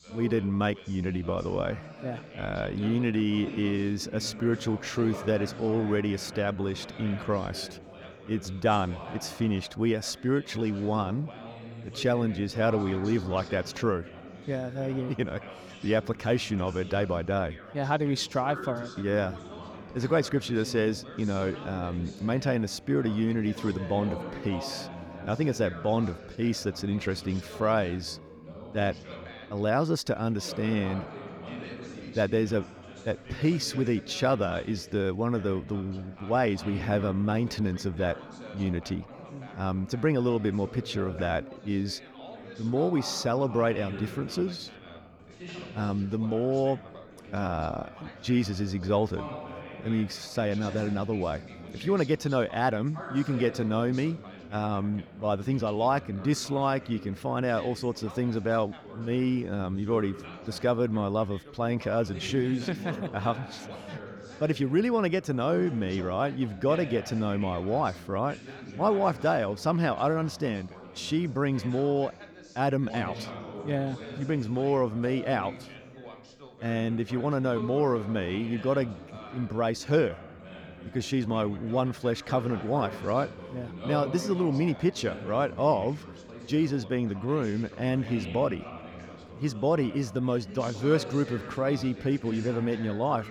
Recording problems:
background chatter; noticeable; throughout; 3 voices, 15 dB below the speech

